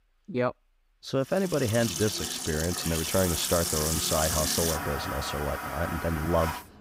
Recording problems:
household noises; loud; from 1.5 s on; 1 dB below the speech

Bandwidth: 15.5 kHz